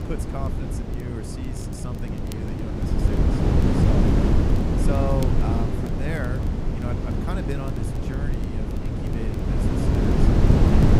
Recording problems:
wind noise on the microphone; heavy; 5 dB above the speech
crackle, like an old record; noticeable; 20 dB below the speech

